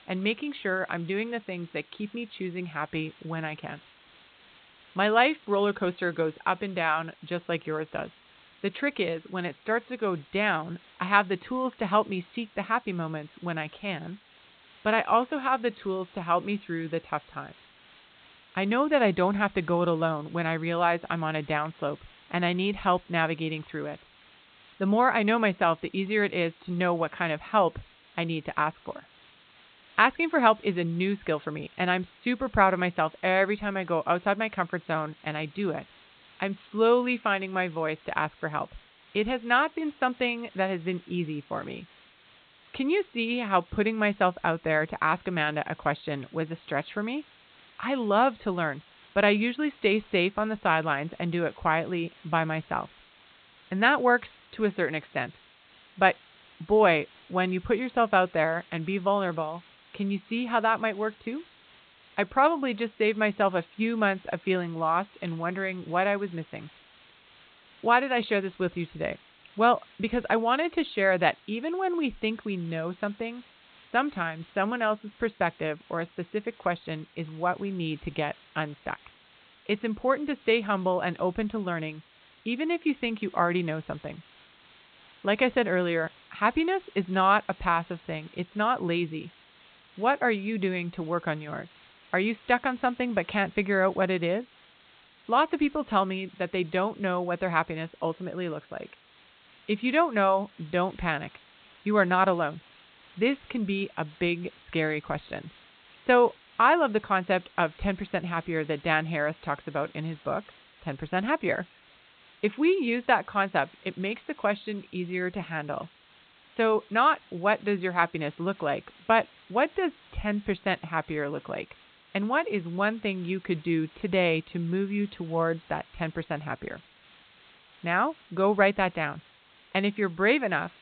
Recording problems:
high frequencies cut off; severe; nothing above 4 kHz
hiss; faint; throughout; 25 dB below the speech

